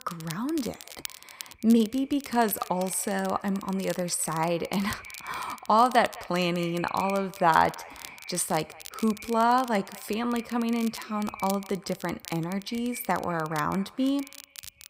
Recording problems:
echo of what is said; faint; throughout; 210 ms later, 20 dB below the speech
crackle, like an old record; noticeable; 15 dB below the speech

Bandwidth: 15.5 kHz